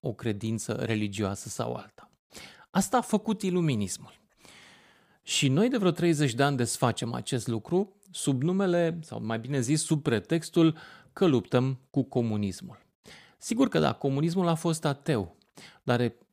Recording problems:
none

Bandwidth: 15 kHz